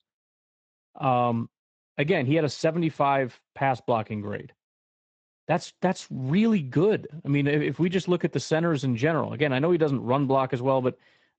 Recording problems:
garbled, watery; slightly; nothing above 8 kHz

